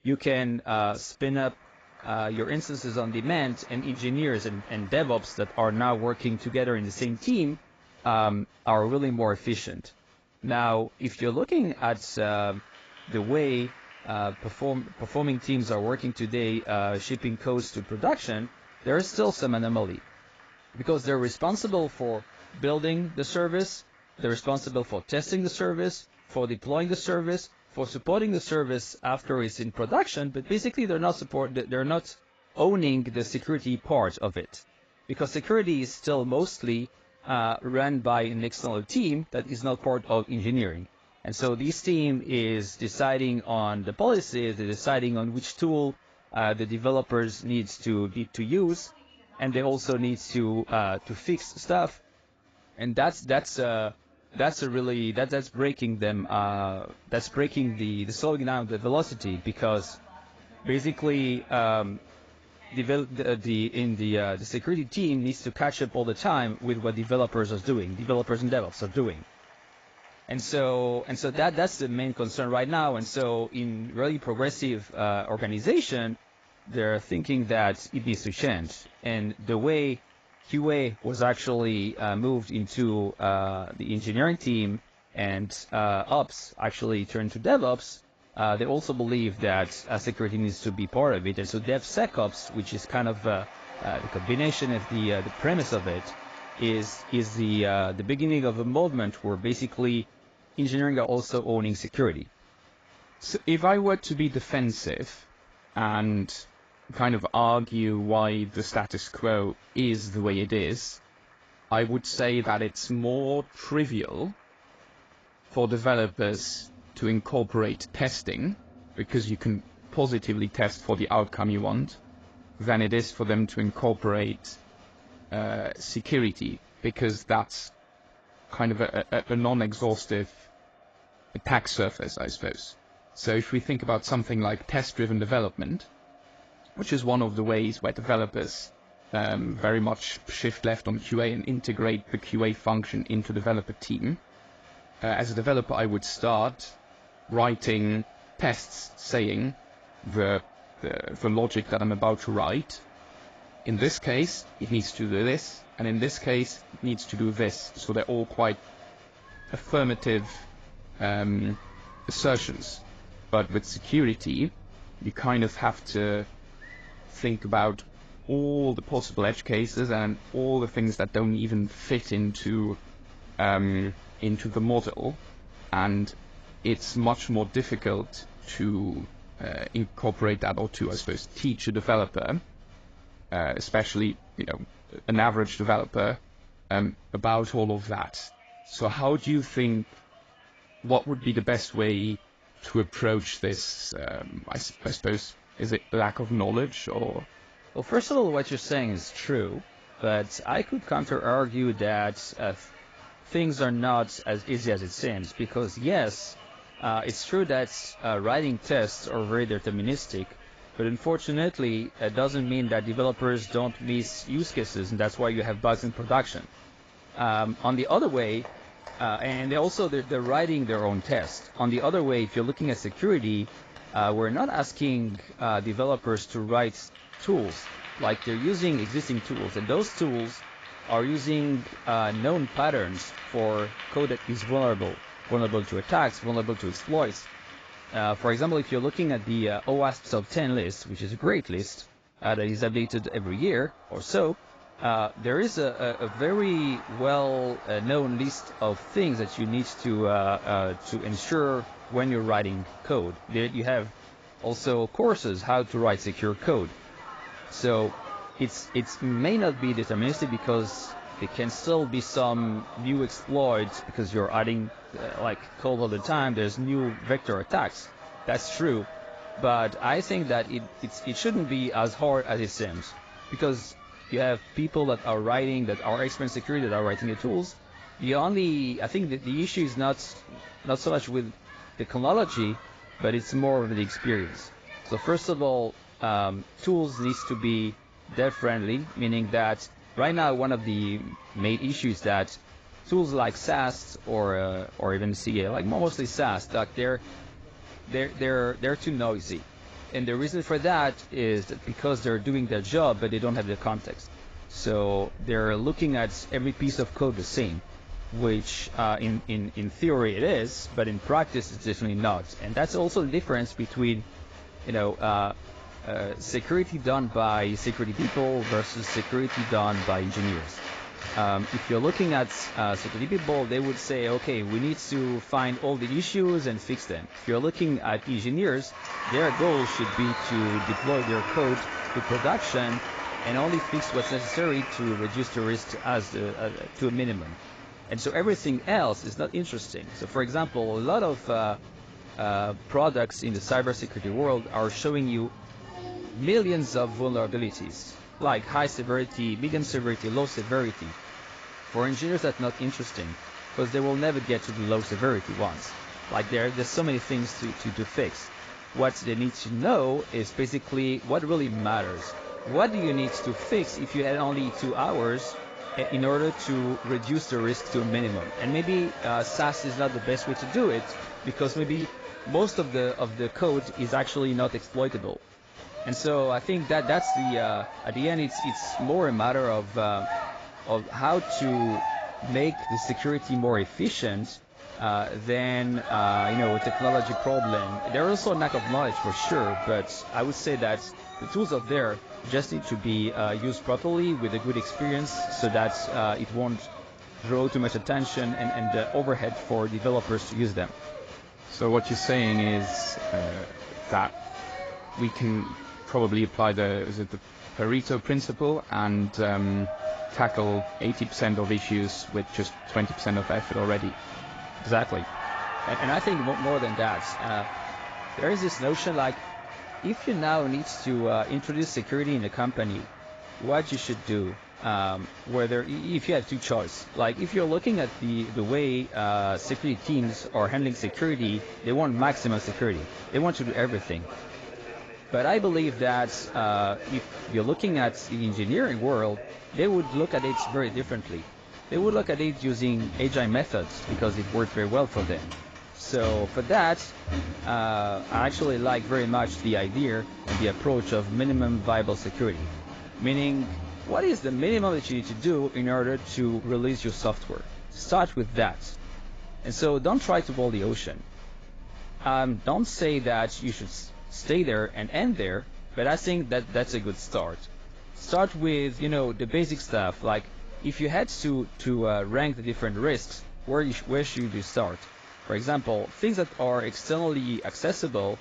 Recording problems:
garbled, watery; badly; nothing above 7.5 kHz
crowd noise; noticeable; throughout; 10 dB below the speech

